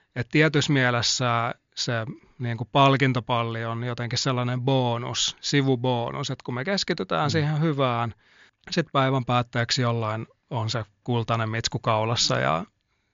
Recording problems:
high frequencies cut off; noticeable; nothing above 7 kHz

